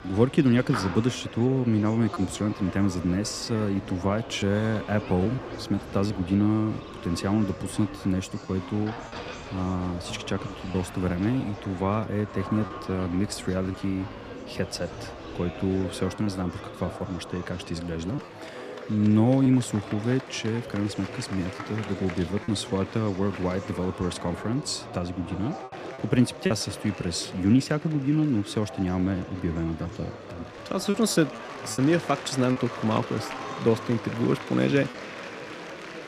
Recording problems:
echo of what is said; faint; throughout; 200 ms later, 20 dB below the speech
murmuring crowd; noticeable; throughout; 10 dB below the speech
choppy; occasionally; 2% of the speech affected

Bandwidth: 14.5 kHz